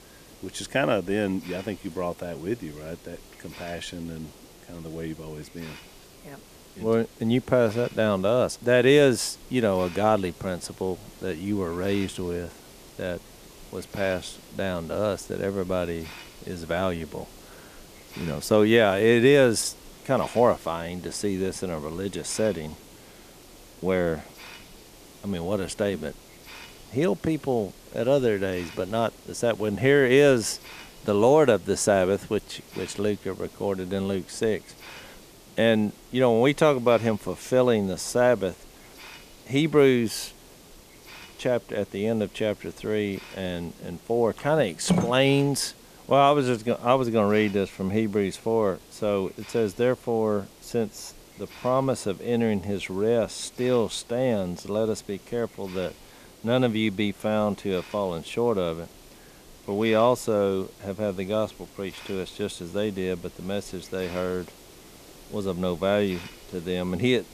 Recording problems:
hiss; faint; throughout; 20 dB below the speech

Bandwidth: 14.5 kHz